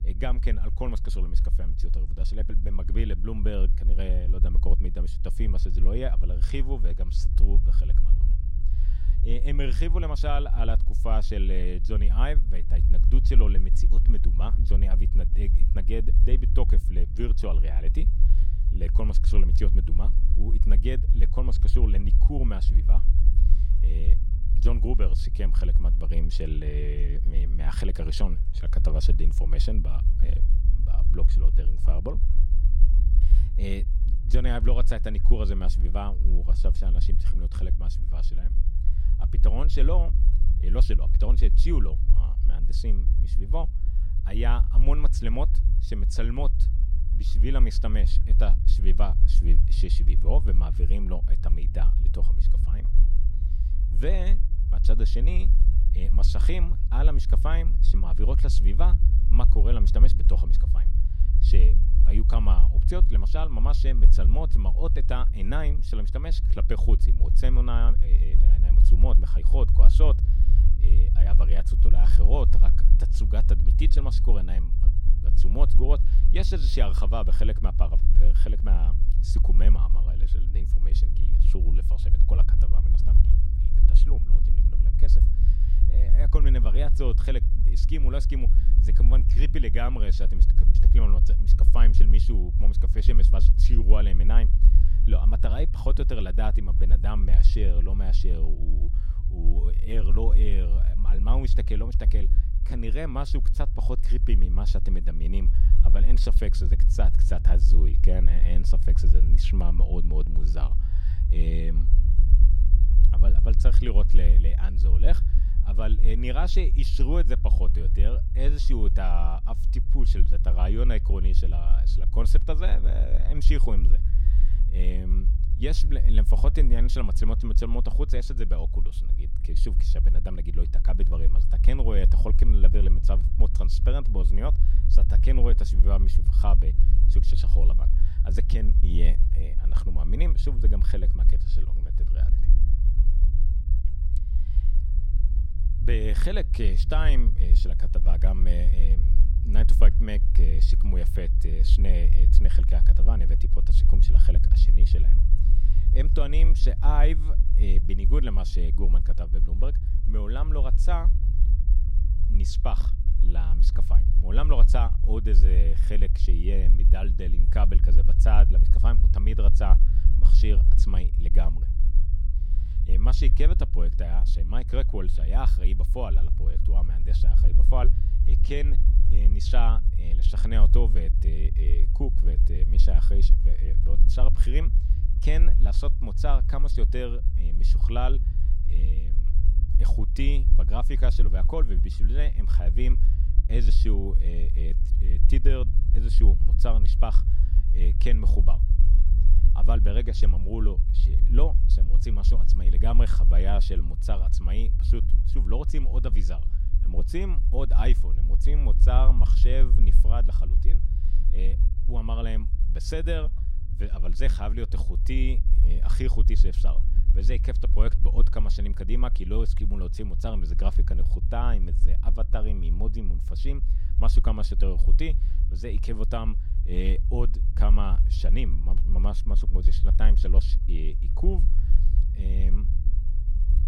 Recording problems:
low rumble; loud; throughout; 8 dB below the speech

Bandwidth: 16.5 kHz